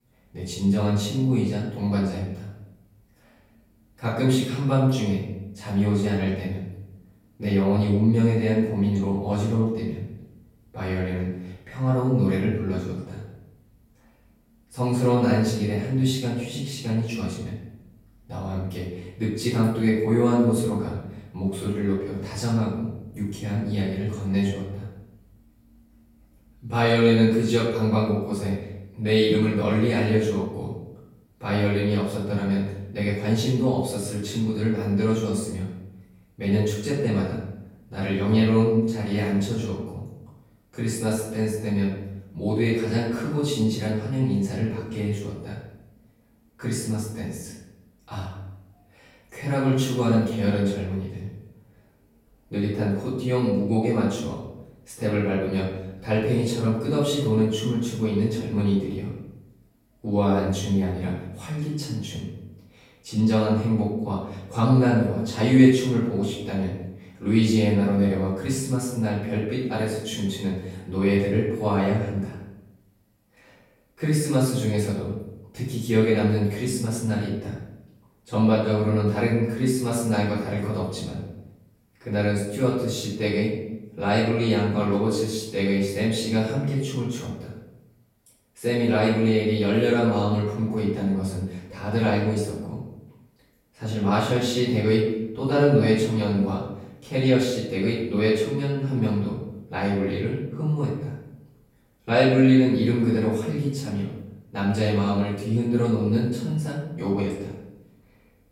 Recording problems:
off-mic speech; far
room echo; noticeable; dies away in 0.8 s

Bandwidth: 16.5 kHz